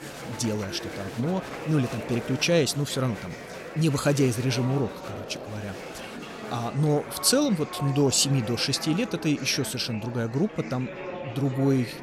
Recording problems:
murmuring crowd; noticeable; throughout; 10 dB below the speech

